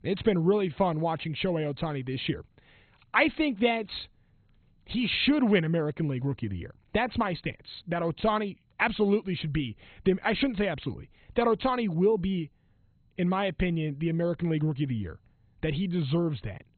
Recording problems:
garbled, watery; badly; nothing above 4 kHz

